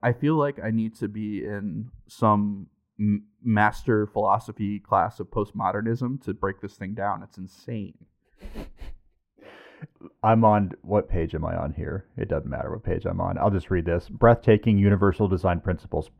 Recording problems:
muffled; very; fading above 2.5 kHz

